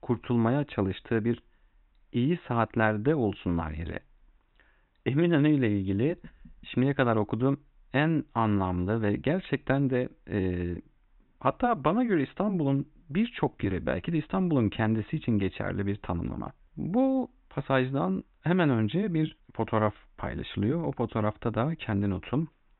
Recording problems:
high frequencies cut off; severe; nothing above 4 kHz

